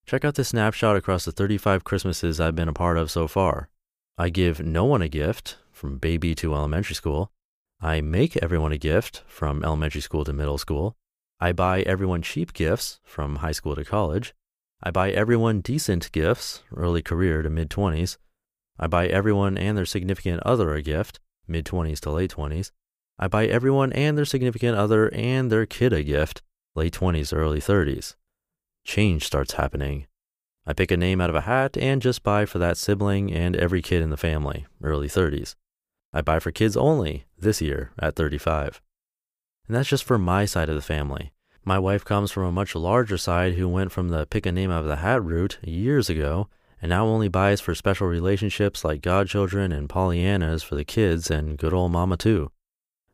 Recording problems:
none

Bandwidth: 15 kHz